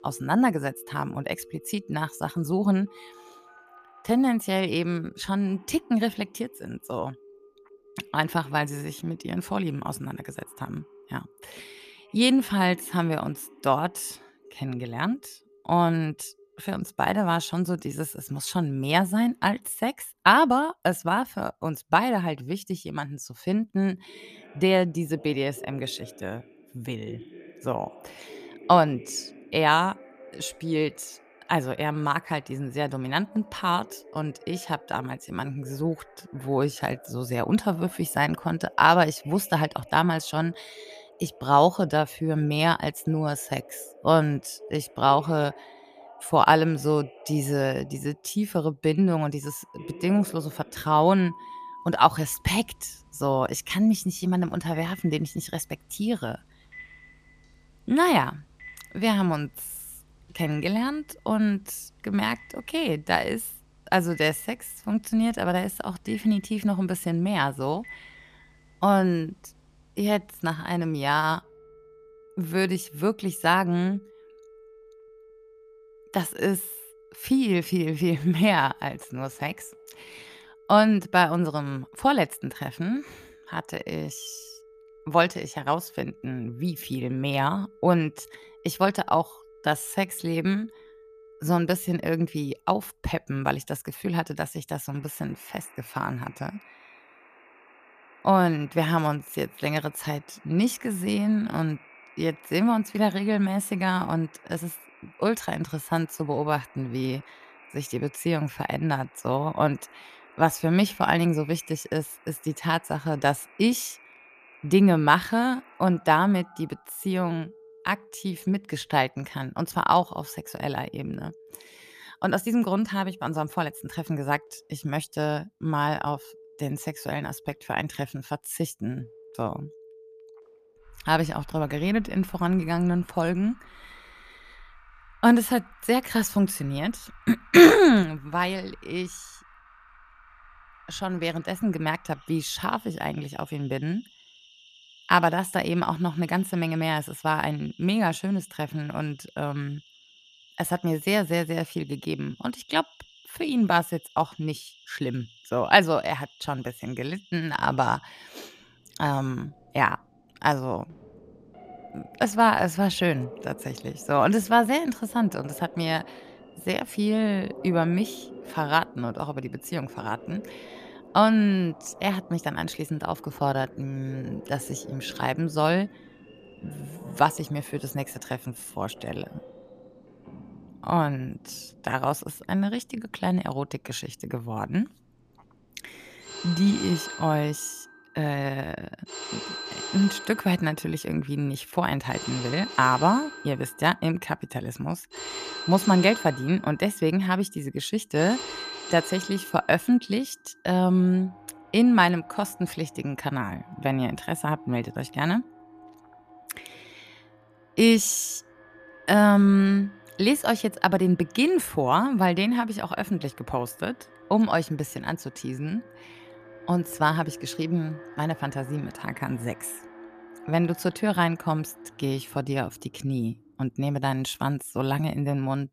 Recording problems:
alarms or sirens; faint; throughout; 20 dB below the speech

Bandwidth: 14.5 kHz